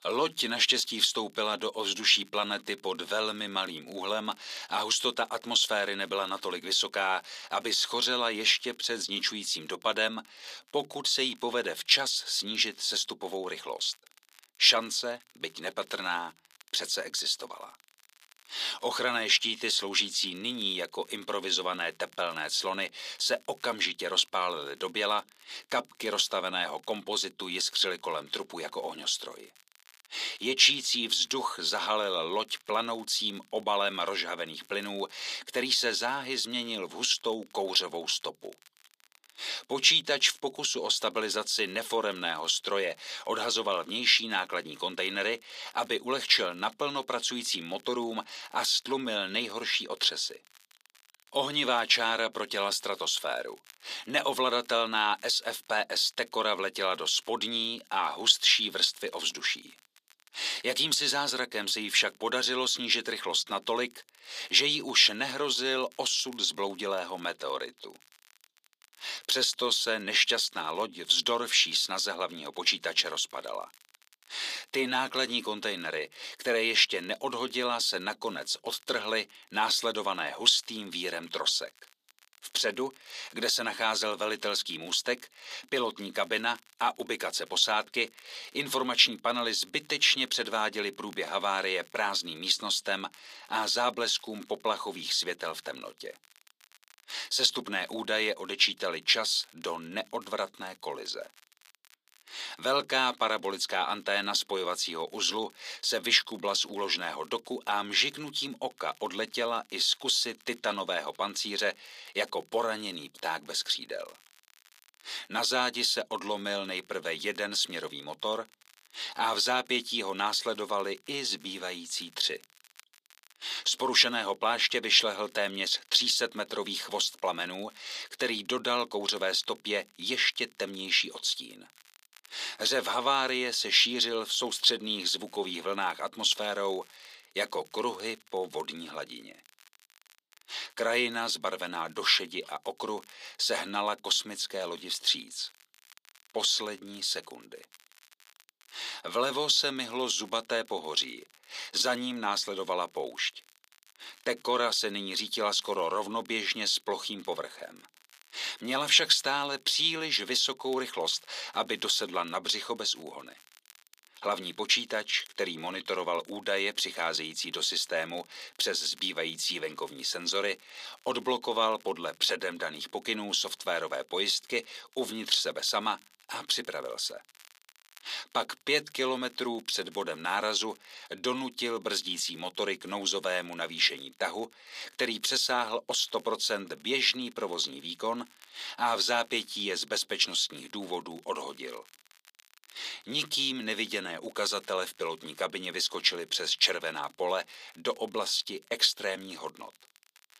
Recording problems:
thin; very; fading below 400 Hz
crackle, like an old record; faint; 30 dB below the speech

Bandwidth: 14.5 kHz